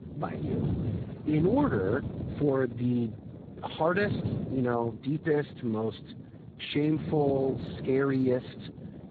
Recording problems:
garbled, watery; badly
wind noise on the microphone; occasional gusts; 15 dB below the speech

